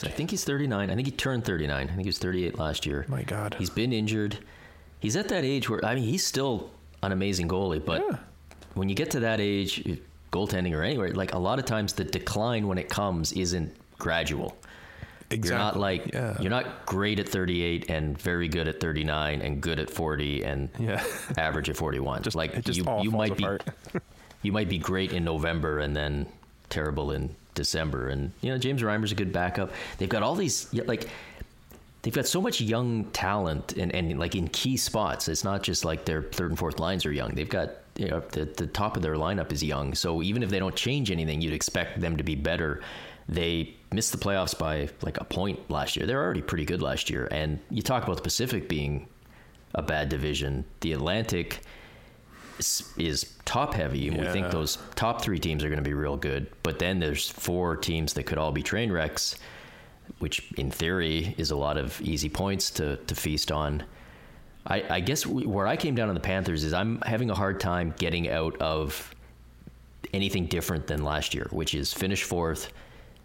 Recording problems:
squashed, flat; heavily

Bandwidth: 16 kHz